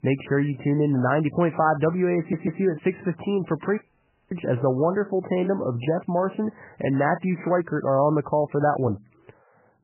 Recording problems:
garbled, watery; badly; nothing above 3 kHz
audio stuttering; at 2 s
audio cutting out; at 4 s for 0.5 s

